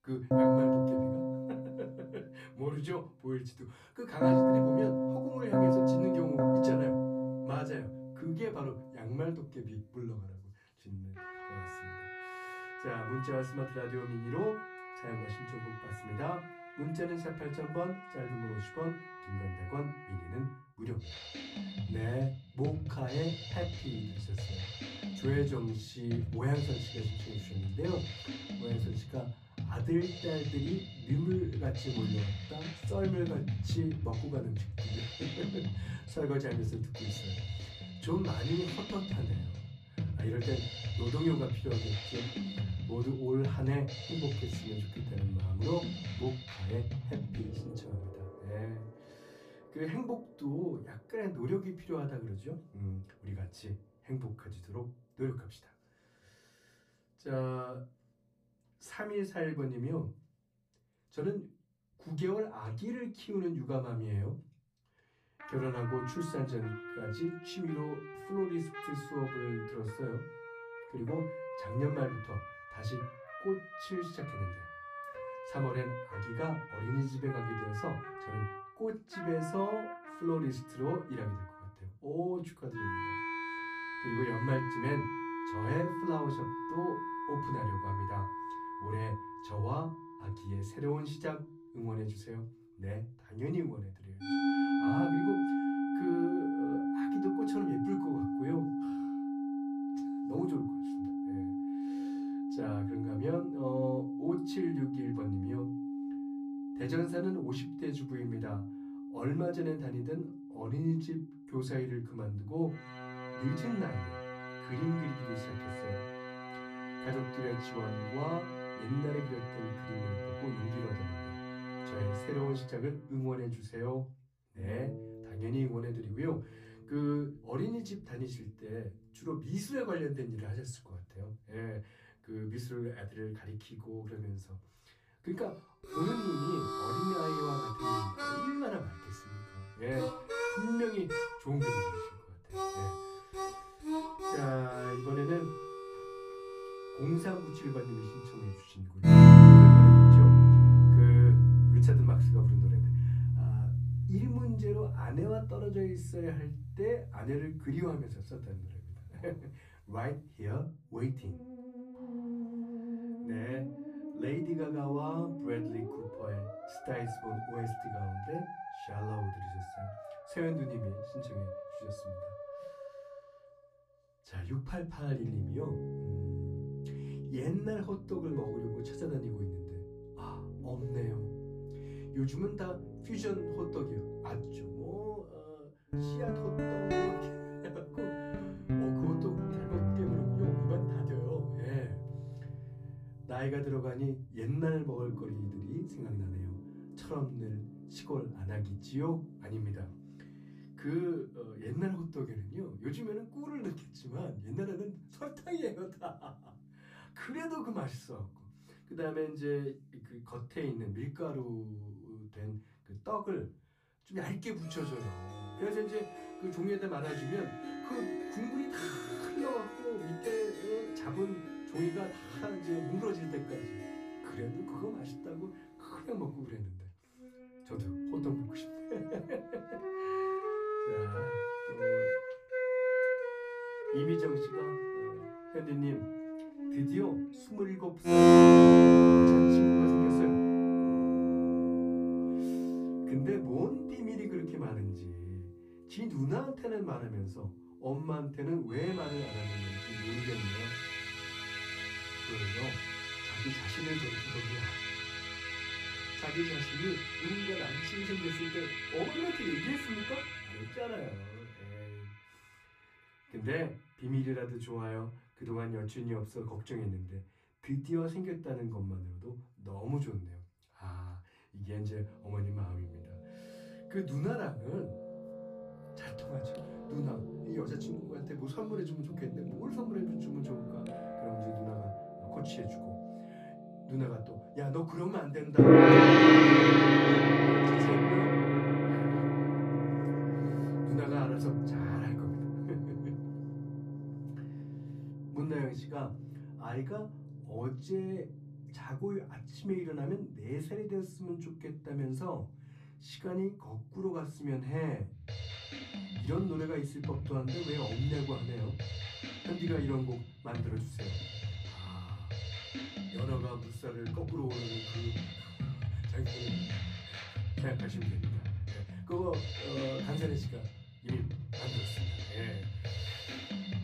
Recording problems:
off-mic speech; far
room echo; very slight; dies away in 0.3 s
background music; very loud; throughout; 10 dB above the speech

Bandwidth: 14.5 kHz